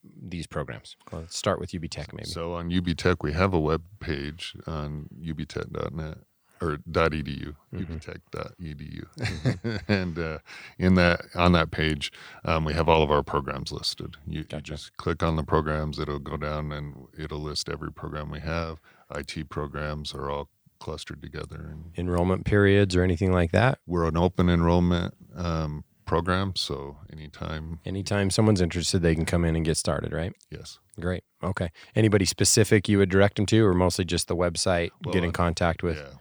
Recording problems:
none

